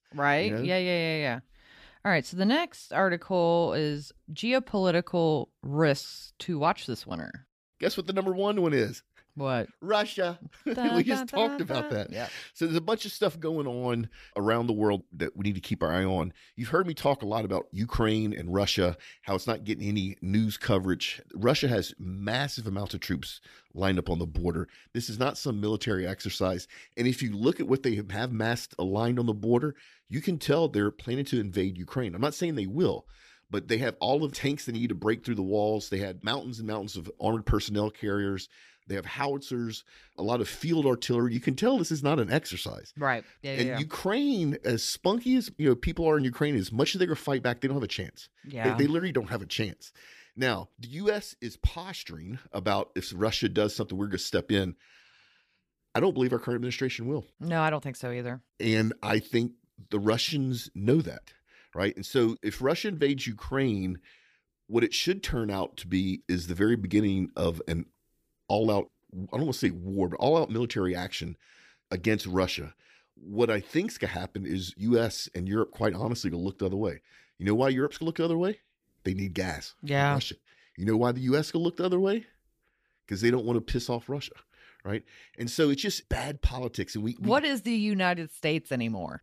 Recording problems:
none

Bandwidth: 15 kHz